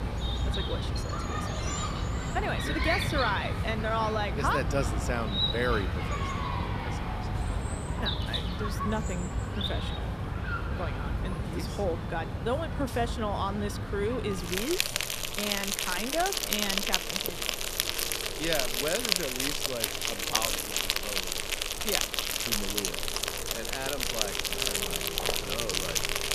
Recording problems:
animal sounds; very loud; throughout; 4 dB above the speech

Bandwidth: 14.5 kHz